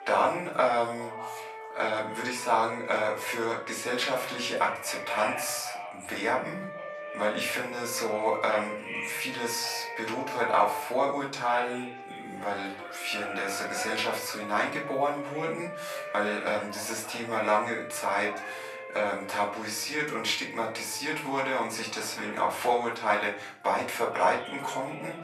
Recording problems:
off-mic speech; far
thin; very; fading below 800 Hz
room echo; slight; dies away in 0.4 s
background music; noticeable; throughout; 10 dB below the speech
background chatter; noticeable; throughout; 4 voices, 10 dB below the speech

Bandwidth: 13.5 kHz